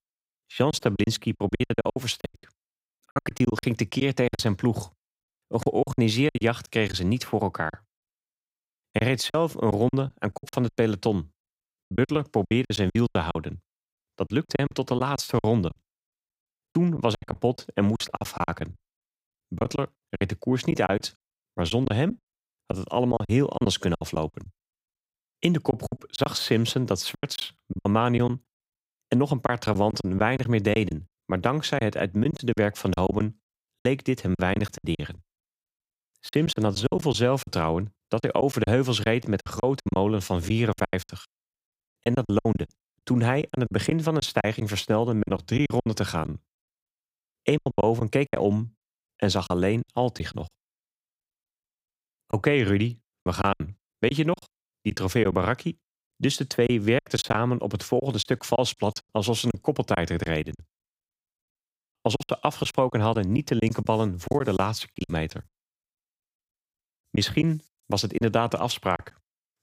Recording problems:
choppy; very; 14% of the speech affected

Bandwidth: 15.5 kHz